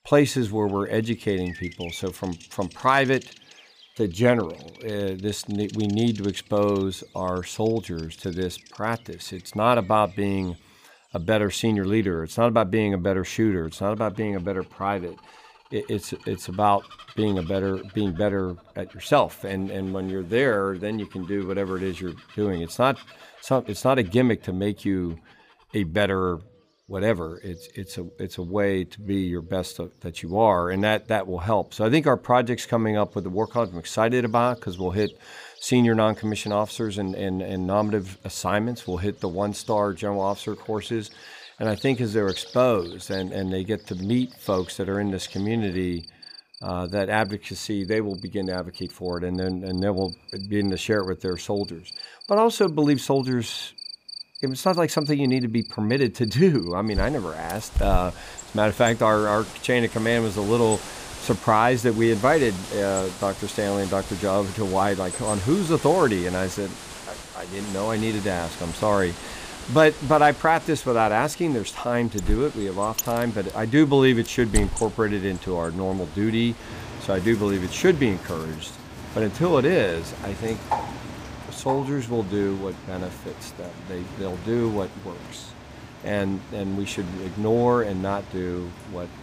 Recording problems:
animal sounds; noticeable; throughout; 15 dB below the speech

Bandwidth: 15 kHz